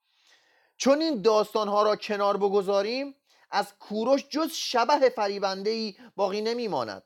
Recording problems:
none

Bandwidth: 17.5 kHz